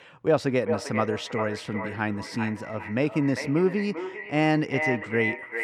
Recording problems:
echo of what is said; strong; throughout; 400 ms later, 6 dB below the speech

